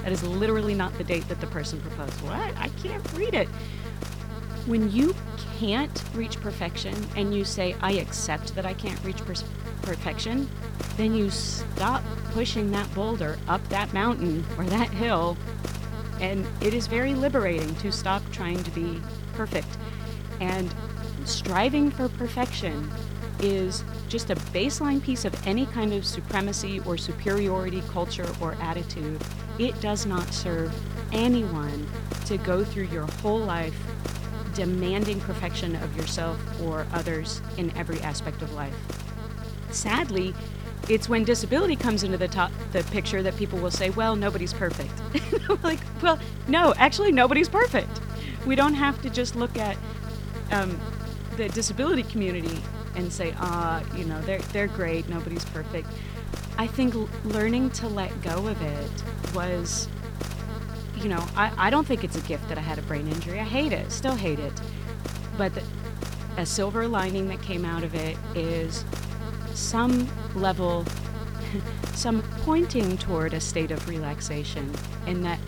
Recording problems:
electrical hum; noticeable; throughout; 50 Hz, 10 dB below the speech

